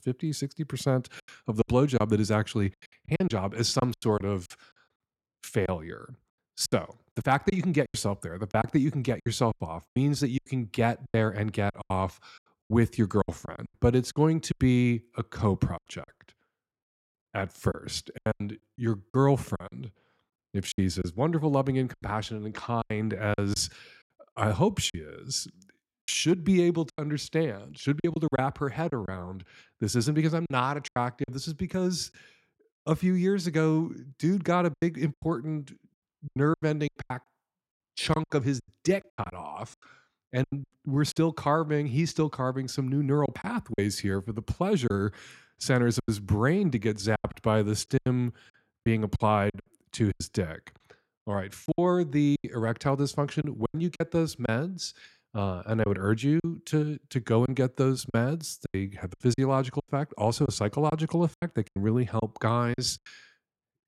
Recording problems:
choppy; very; 11% of the speech affected

